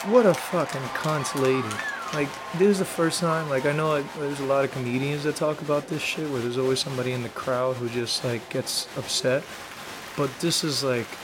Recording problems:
crowd noise; loud; throughout; 10 dB below the speech

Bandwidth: 16.5 kHz